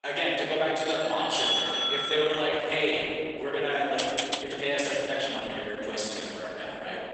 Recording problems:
room echo; strong; dies away in 3 s
off-mic speech; far
garbled, watery; badly; nothing above 8 kHz
thin; somewhat; fading below 500 Hz
doorbell; loud; from 1 to 2.5 s; peak 4 dB above the speech
uneven, jittery; strongly; from 1 to 6.5 s
keyboard typing; noticeable; at 4 s; peak 3 dB below the speech

